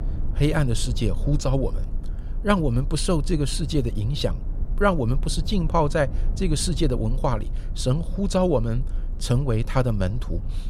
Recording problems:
low rumble; faint; throughout; 20 dB below the speech

